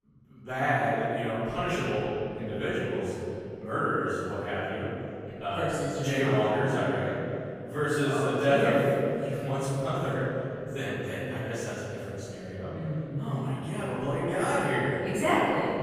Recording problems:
room echo; strong; dies away in 2.8 s
off-mic speech; far

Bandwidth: 15 kHz